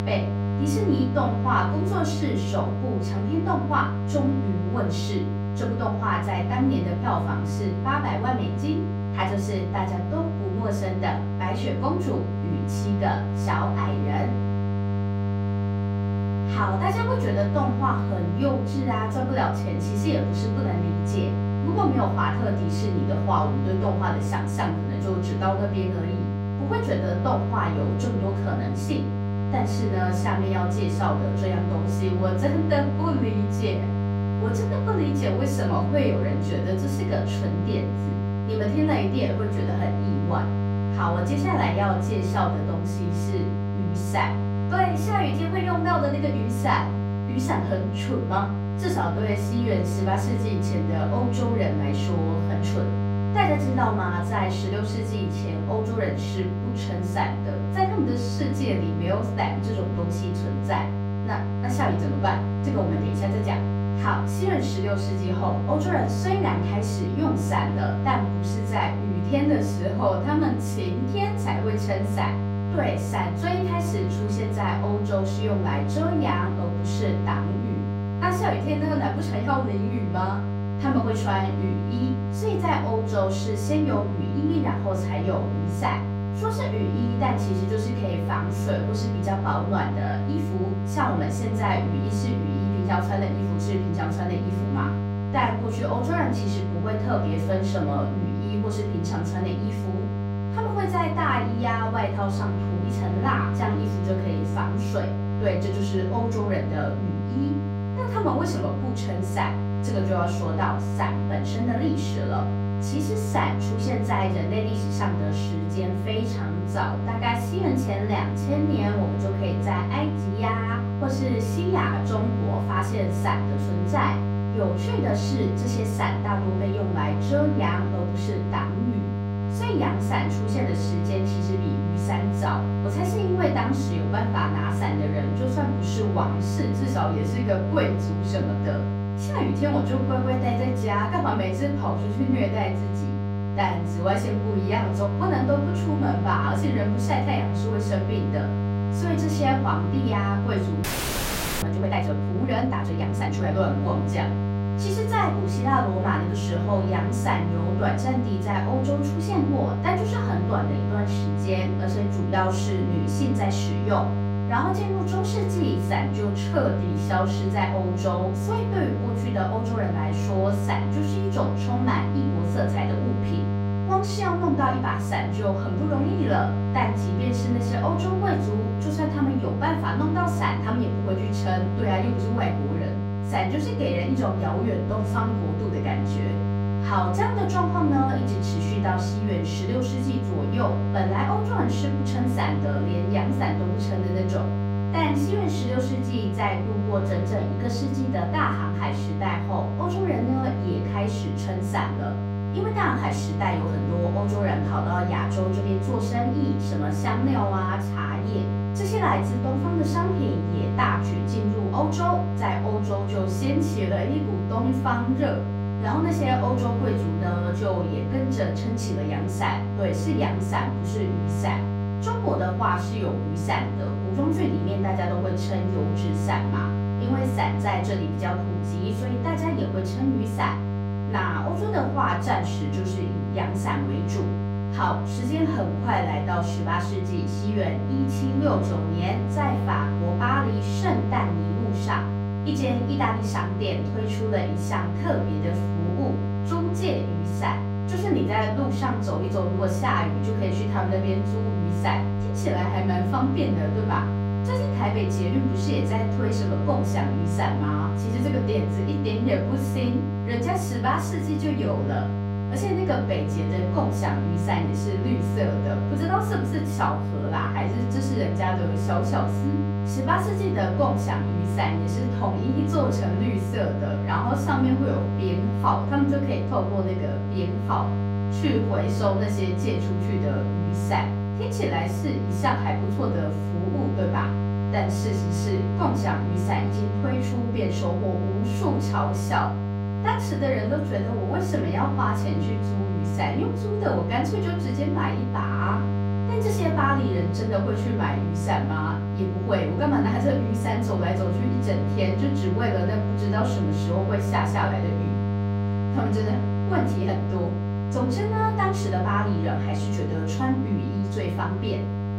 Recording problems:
off-mic speech; far
room echo; slight; dies away in 0.4 s
electrical hum; loud; throughout; 50 Hz, 6 dB below the speech
audio freezing; at 2:31 for 1 s

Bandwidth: 16 kHz